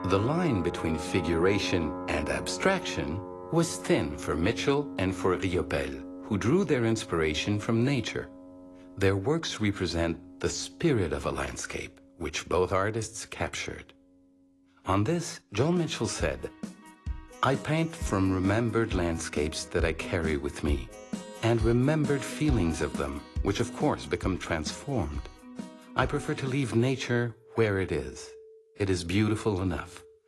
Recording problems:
garbled, watery; slightly; nothing above 11.5 kHz
background music; noticeable; throughout; 10 dB below the speech

